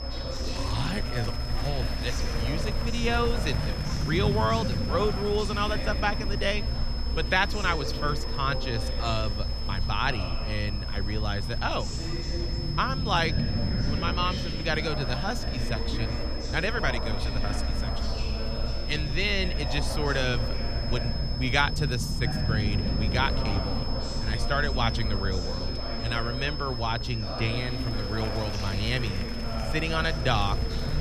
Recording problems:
high-pitched whine; loud; throughout; 5 kHz, 8 dB below the speech
murmuring crowd; loud; throughout; 8 dB below the speech
low rumble; noticeable; throughout; 15 dB below the speech
electrical hum; very faint; throughout; 50 Hz, 15 dB below the speech

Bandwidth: 14 kHz